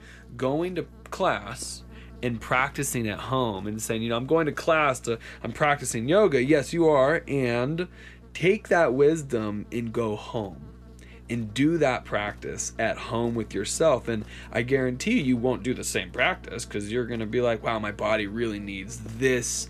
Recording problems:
electrical hum; faint; throughout; 60 Hz, 25 dB below the speech

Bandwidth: 14 kHz